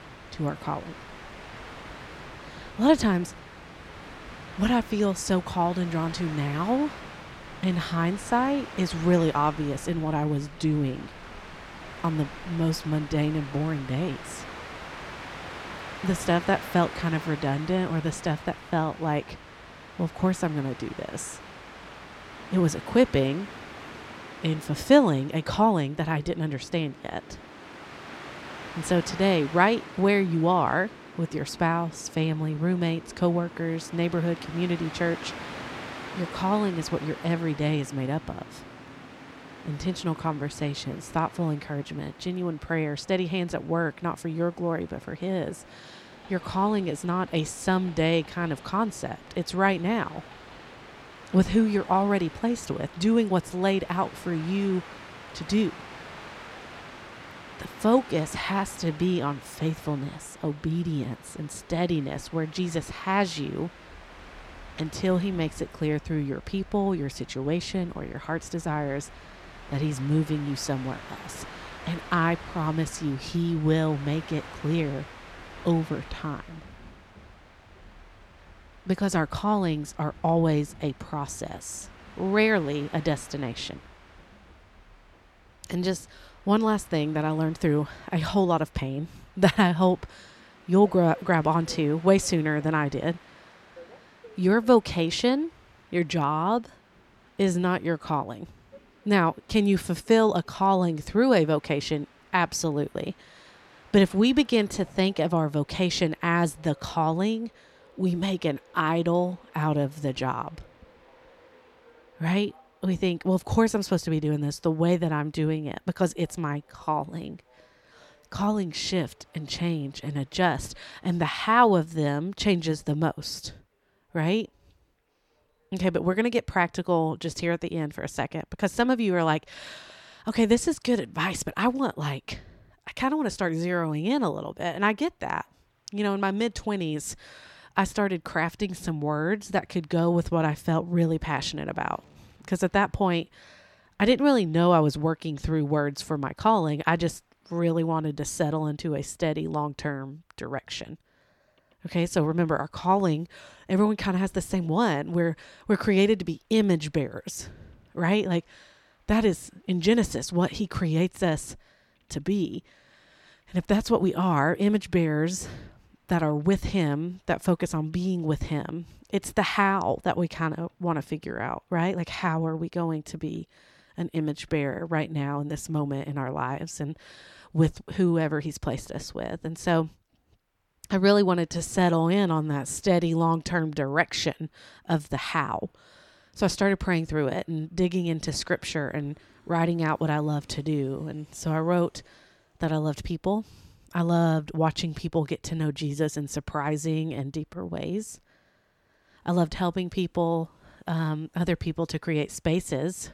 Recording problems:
train or aircraft noise; noticeable; throughout; 15 dB below the speech

